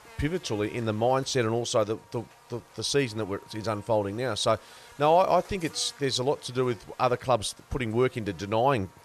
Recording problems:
electrical hum; faint; throughout; 50 Hz, 25 dB below the speech

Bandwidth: 13.5 kHz